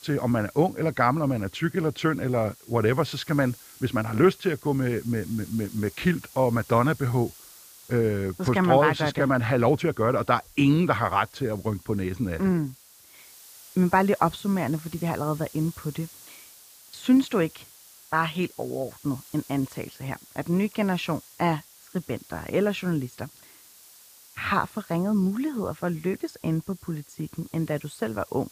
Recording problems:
hiss; faint; throughout; 20 dB below the speech

